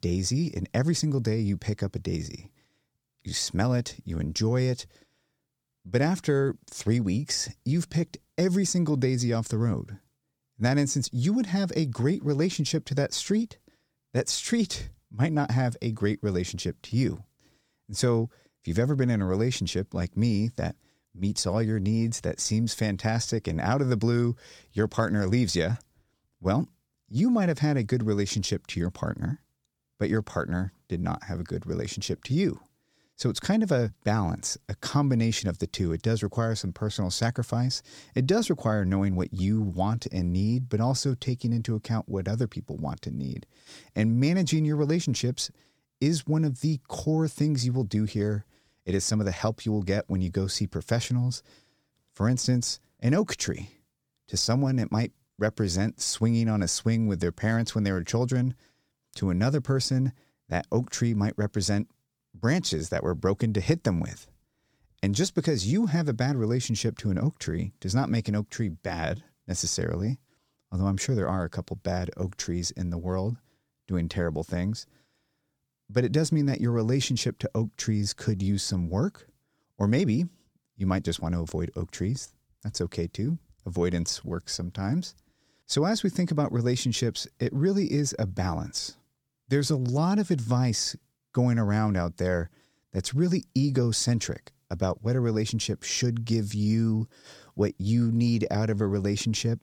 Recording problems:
none

